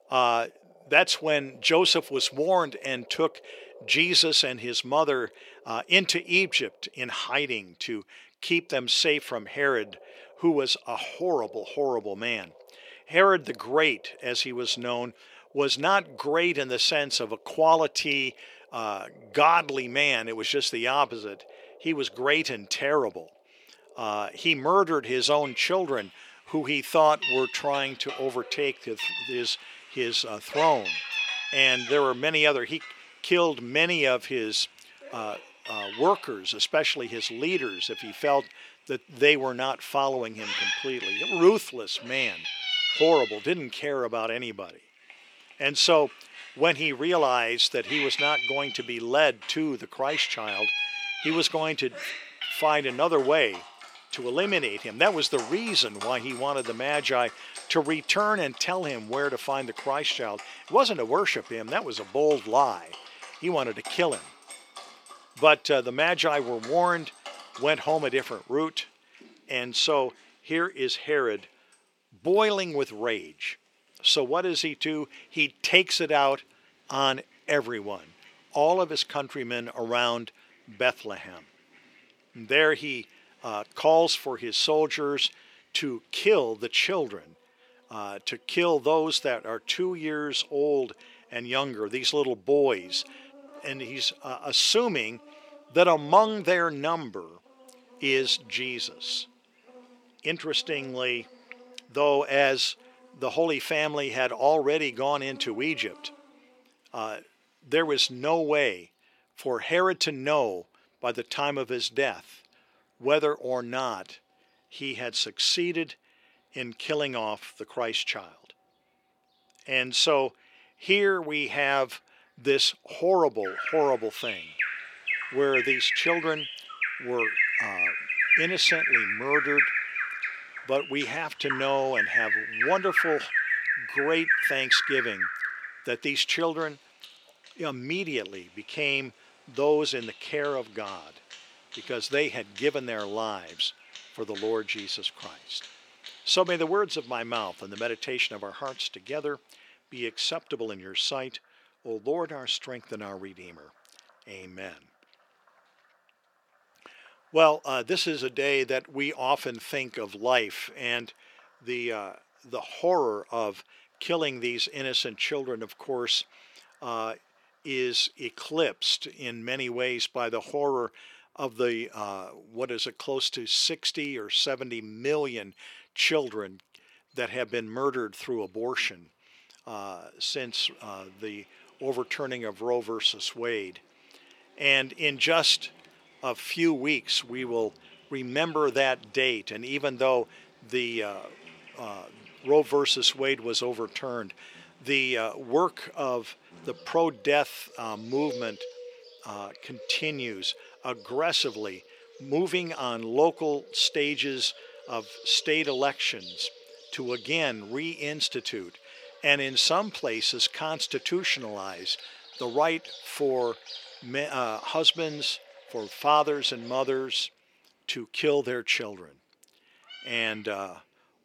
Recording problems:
thin; somewhat; fading below 350 Hz
animal sounds; loud; throughout; 5 dB below the speech

